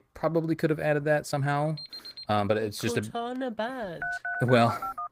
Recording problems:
garbled, watery; slightly; nothing above 15.5 kHz
uneven, jittery; strongly; from 1 to 4.5 s
alarm; faint; at 2 s; peak 10 dB below the speech
phone ringing; noticeable; from 4 s on; peak 4 dB below the speech

